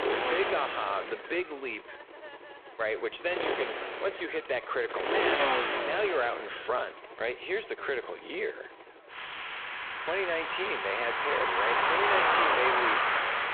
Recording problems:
phone-call audio; poor line; nothing above 3.5 kHz
traffic noise; very loud; throughout; 4 dB above the speech

